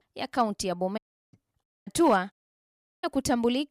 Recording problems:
audio cutting out; at 1 s, at 1.5 s and at 2.5 s for 0.5 s

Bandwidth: 15.5 kHz